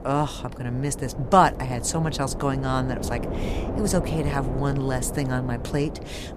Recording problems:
wind noise on the microphone; occasional gusts; 10 dB below the speech

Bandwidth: 14.5 kHz